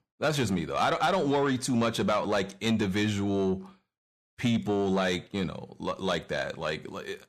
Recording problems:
distortion; slight; 10 dB below the speech

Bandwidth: 15 kHz